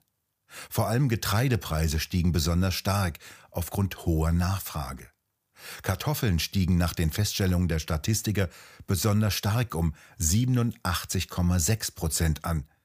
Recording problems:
none

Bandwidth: 15 kHz